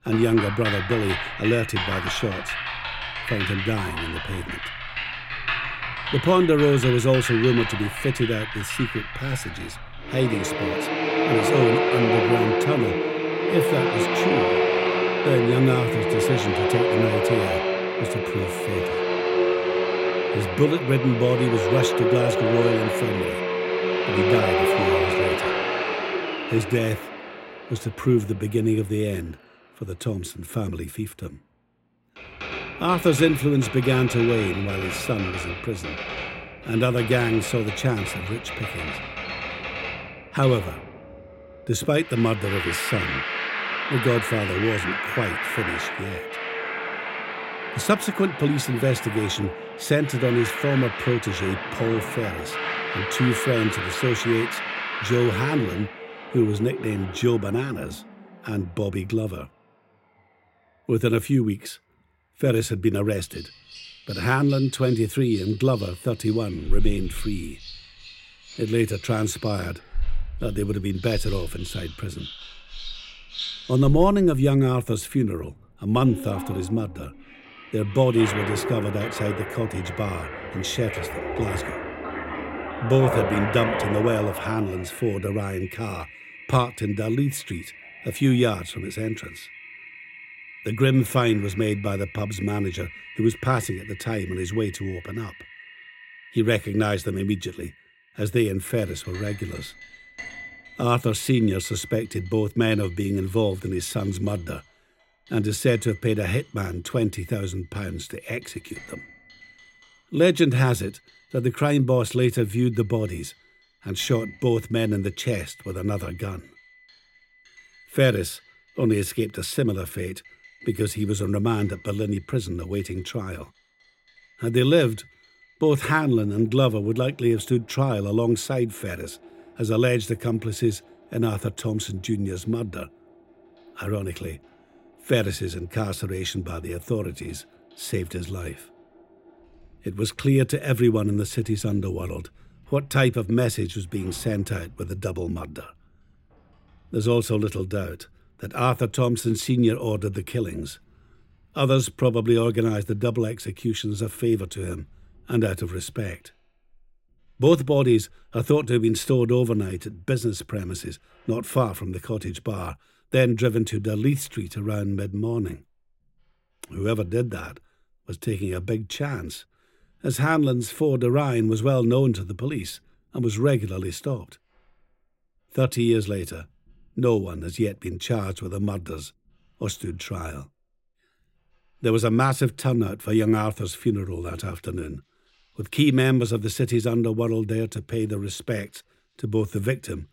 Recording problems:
household noises; loud; throughout; 3 dB below the speech

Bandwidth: 16 kHz